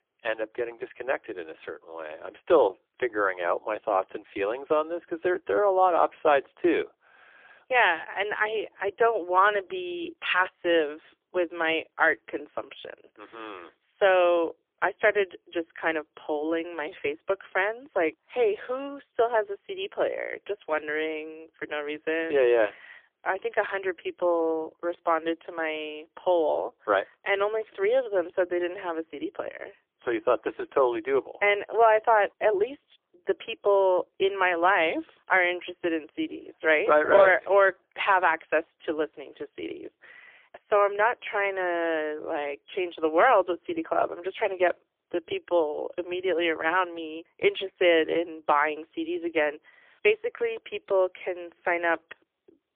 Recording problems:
phone-call audio; poor line; nothing above 3.5 kHz

